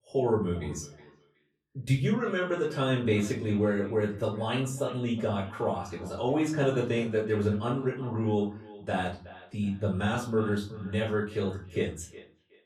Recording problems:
off-mic speech; far
echo of what is said; faint; throughout; 370 ms later, 20 dB below the speech
room echo; slight; dies away in 0.4 s

